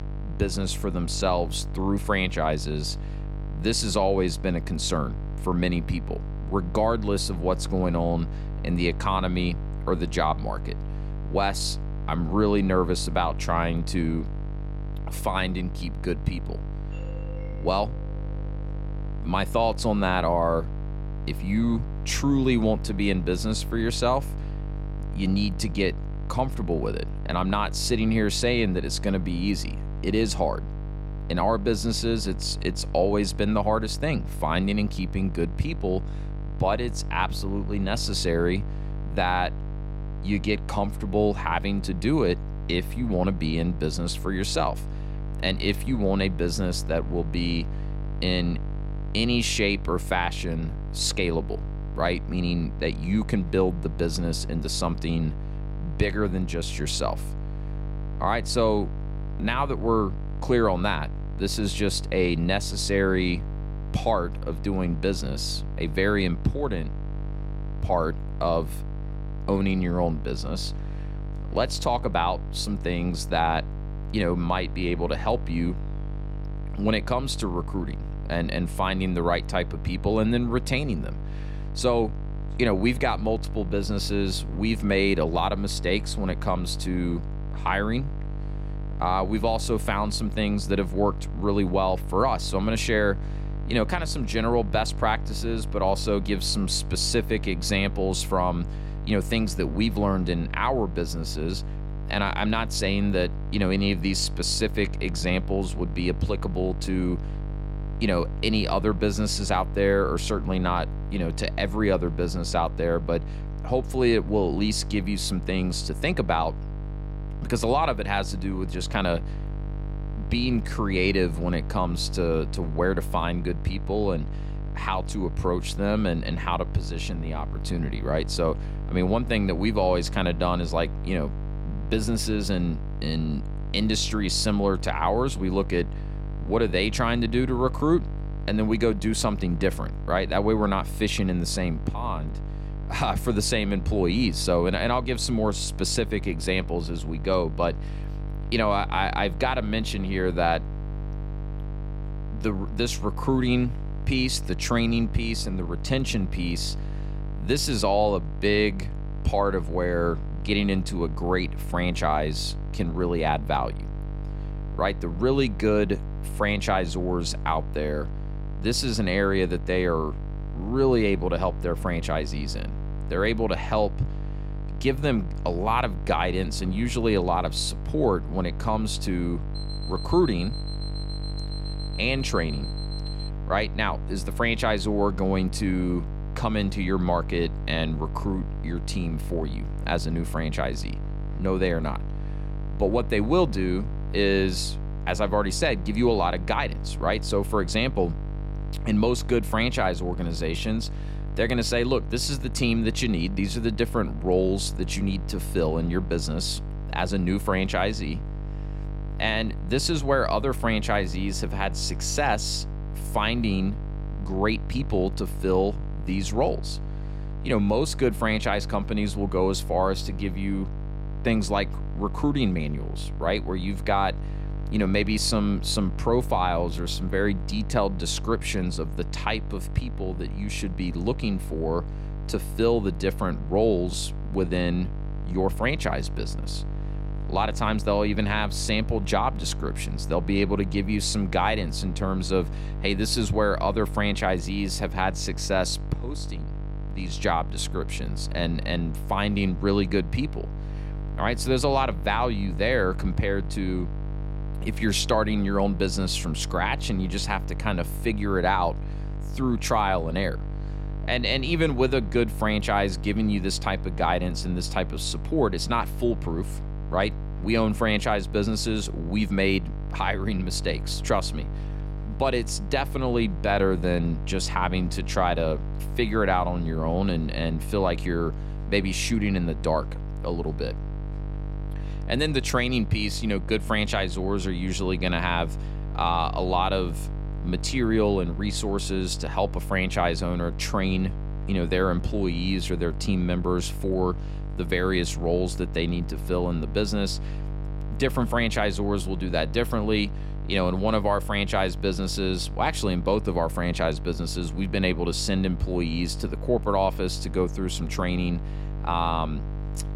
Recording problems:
electrical hum; noticeable; throughout; 50 Hz, 15 dB below the speech
doorbell; faint; from 17 to 19 s; peak 20 dB below the speech
alarm; faint; from 3:00 to 3:03; peak 10 dB below the speech

